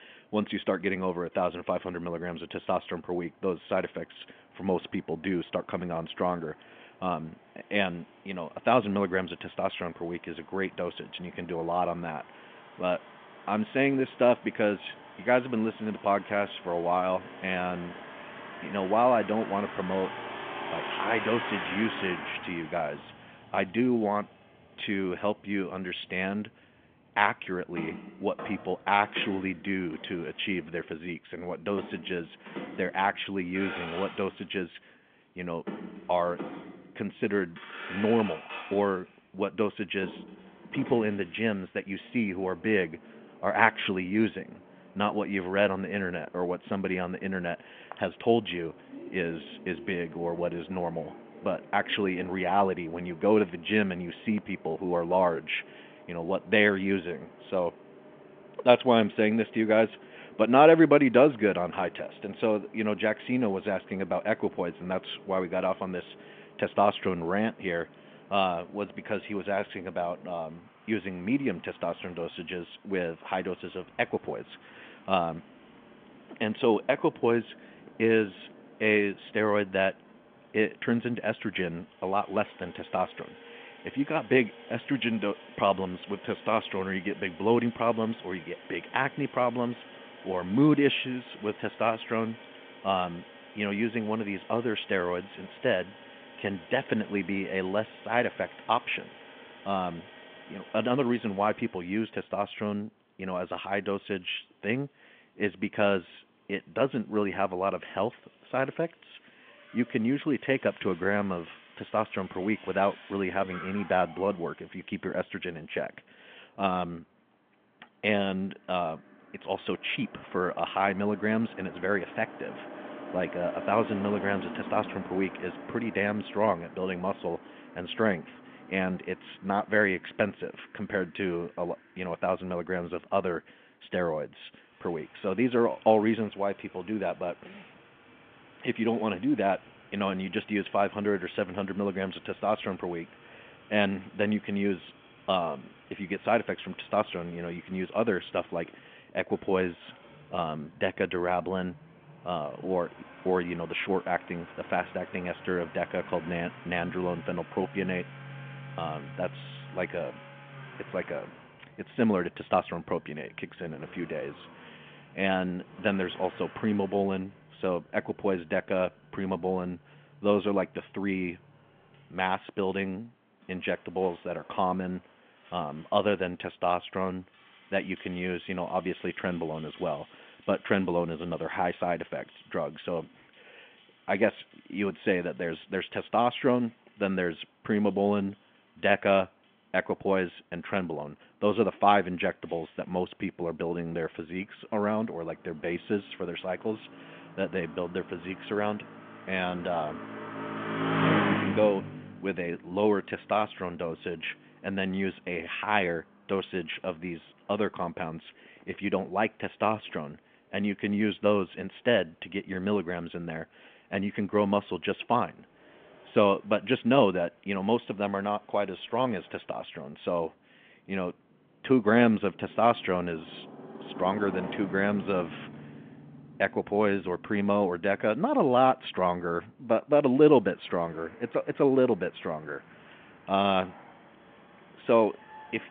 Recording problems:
phone-call audio; nothing above 3.5 kHz
traffic noise; noticeable; throughout; 15 dB below the speech

